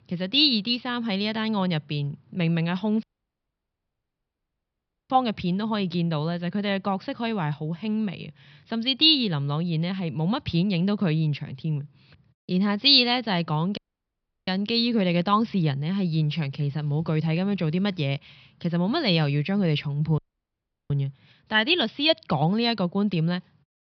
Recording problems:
high frequencies cut off; noticeable; nothing above 5.5 kHz
audio cutting out; at 3 s for 2 s, at 14 s for 0.5 s and at 20 s for 0.5 s

